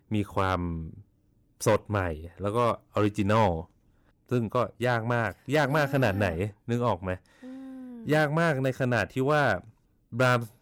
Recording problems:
distortion; slight; 2% of the sound clipped

